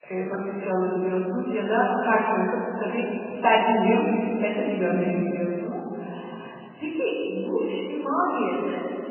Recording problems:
off-mic speech; far
garbled, watery; badly; nothing above 3 kHz
room echo; noticeable; dies away in 2.5 s

